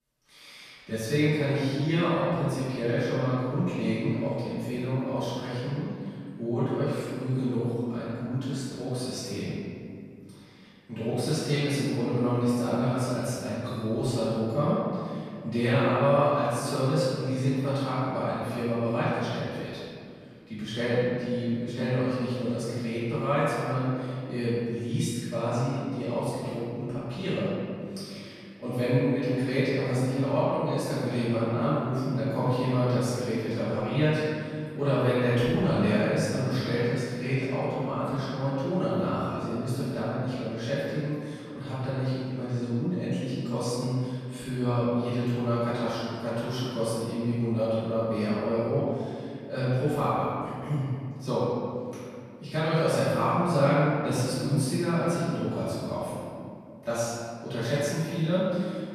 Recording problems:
room echo; strong; dies away in 2.2 s
off-mic speech; far

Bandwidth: 14 kHz